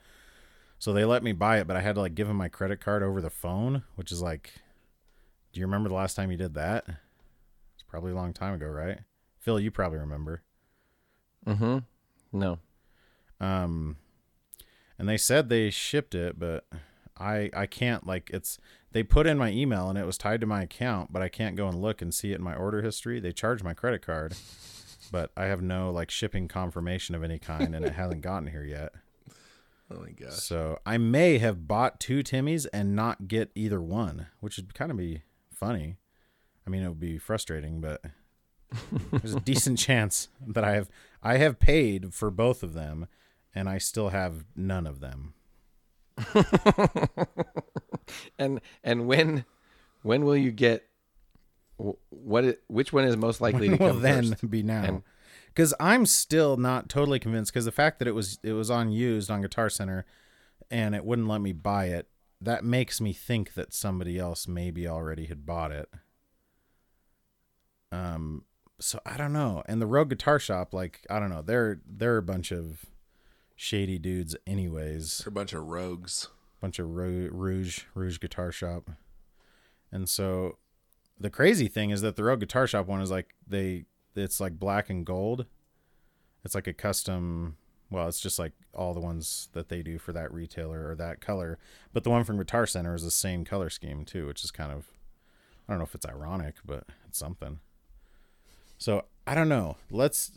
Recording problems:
none

